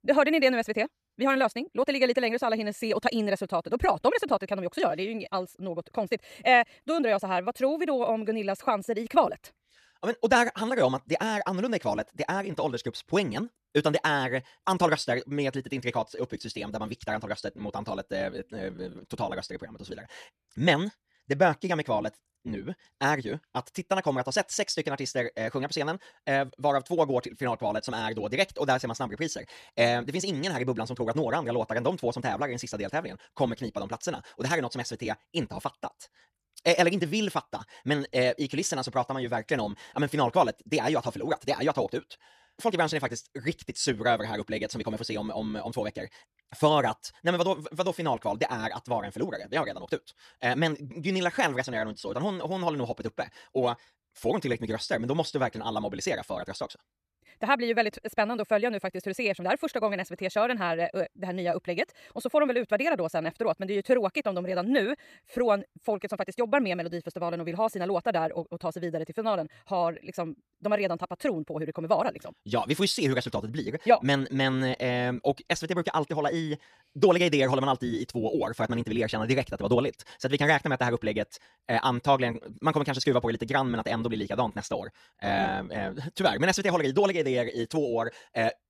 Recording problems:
wrong speed, natural pitch; too fast; 1.5 times normal speed

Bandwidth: 14.5 kHz